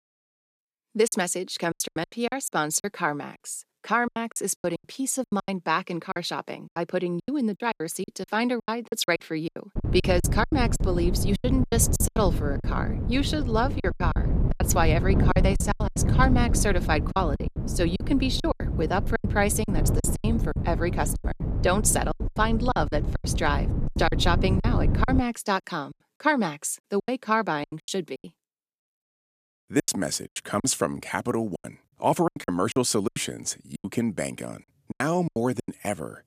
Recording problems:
wind noise on the microphone; occasional gusts; from 10 to 25 s; 10 dB below the speech
choppy; very; 16% of the speech affected

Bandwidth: 14.5 kHz